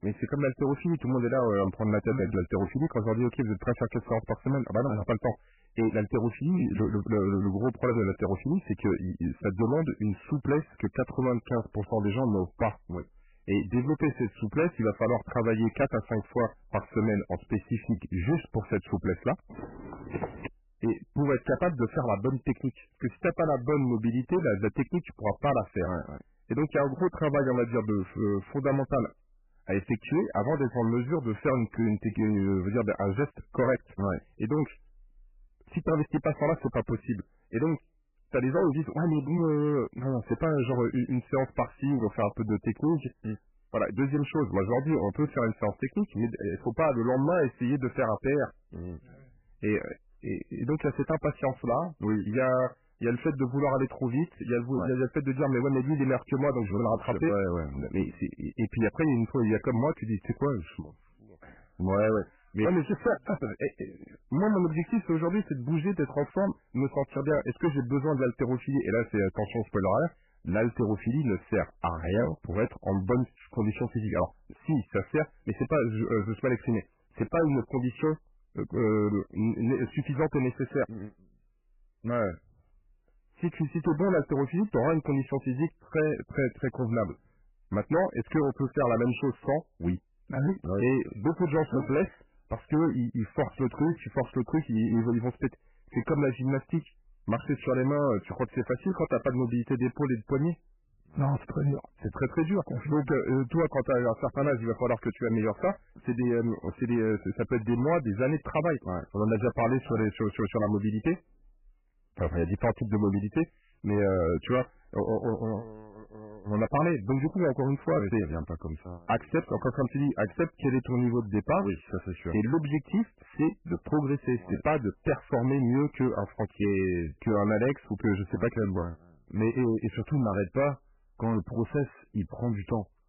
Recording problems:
garbled, watery; badly; nothing above 3 kHz
distortion; slight; 7% of the sound clipped
footsteps; noticeable; at 20 s; peak 8 dB below the speech

